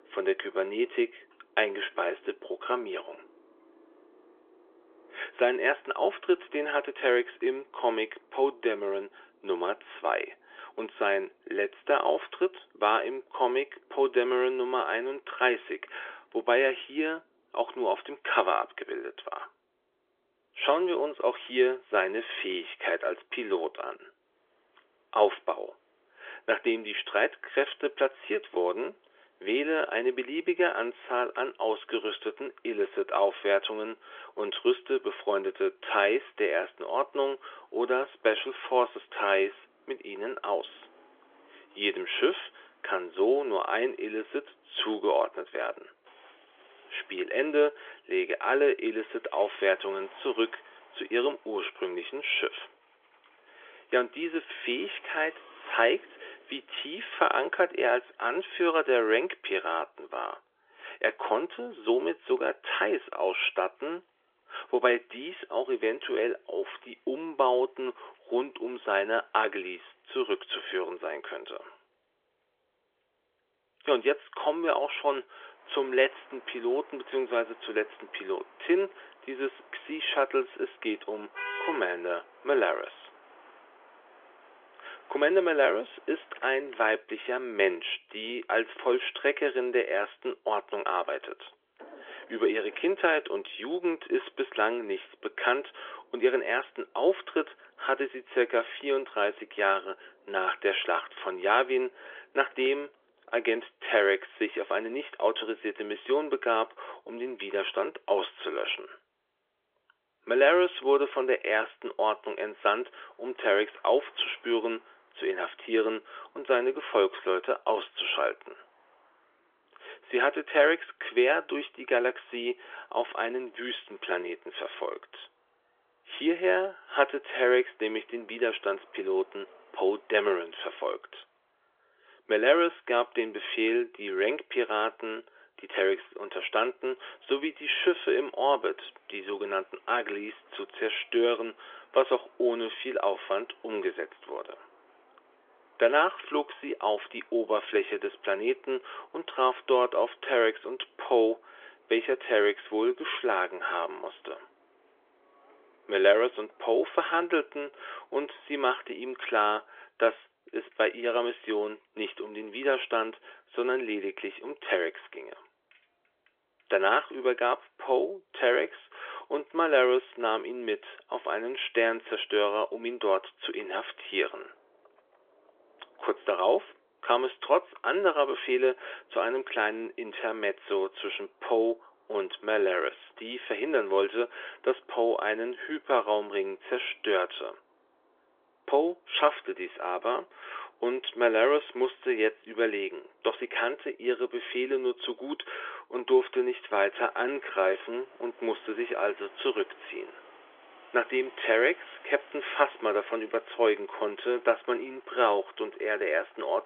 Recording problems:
phone-call audio; nothing above 3.5 kHz
traffic noise; faint; throughout; 25 dB below the speech

